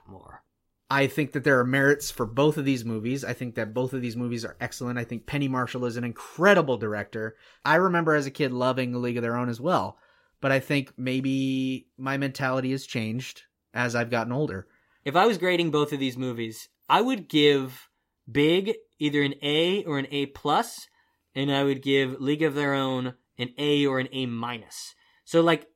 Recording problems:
none

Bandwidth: 16 kHz